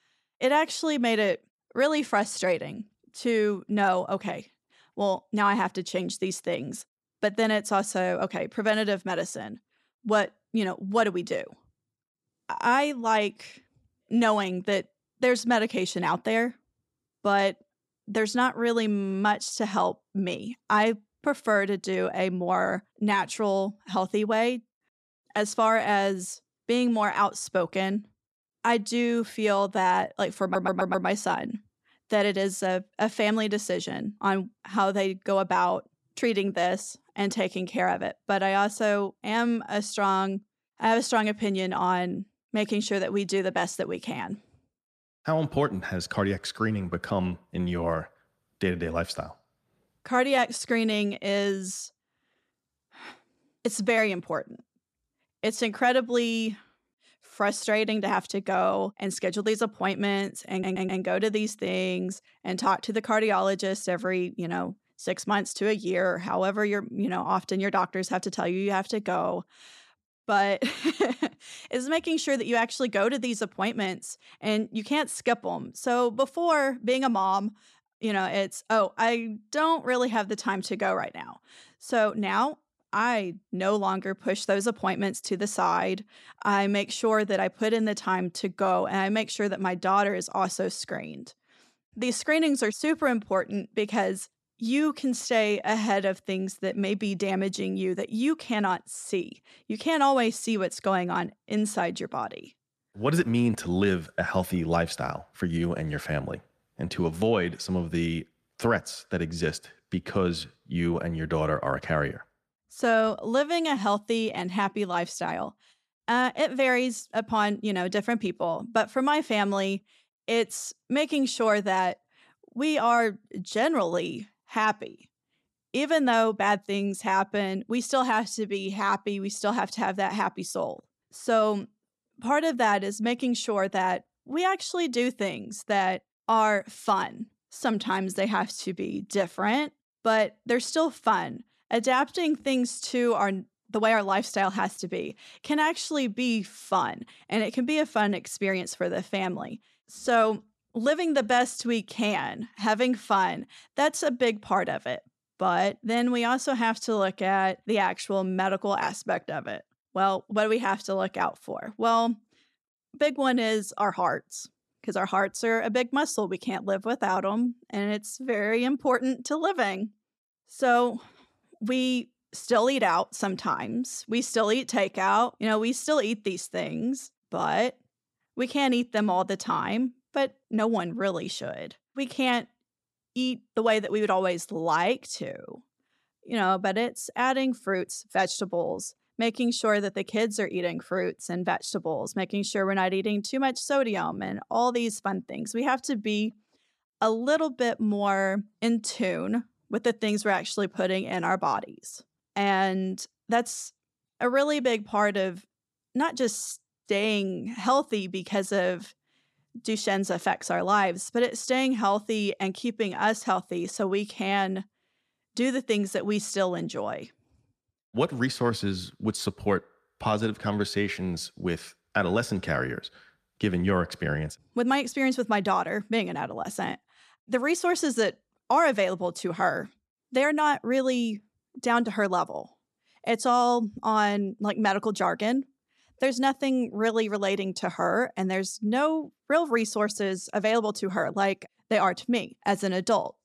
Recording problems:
audio stuttering; at 30 s and at 1:01

